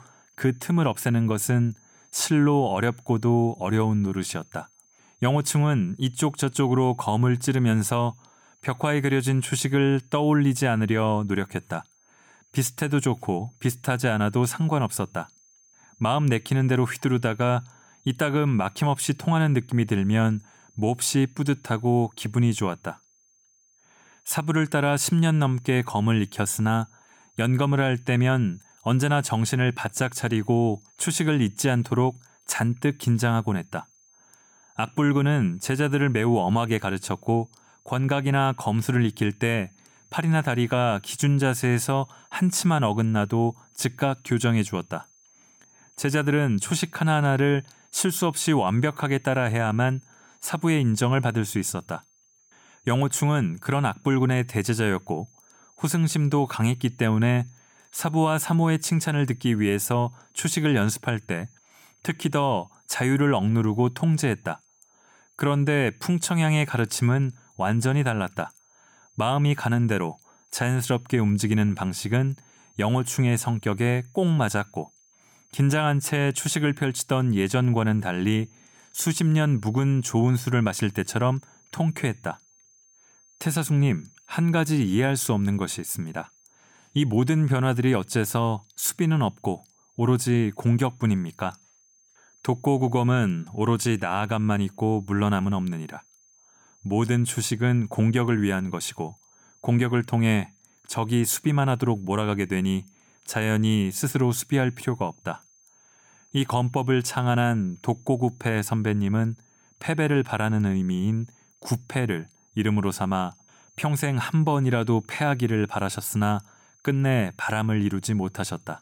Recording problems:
high-pitched whine; faint; throughout; 6.5 kHz, 35 dB below the speech

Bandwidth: 17.5 kHz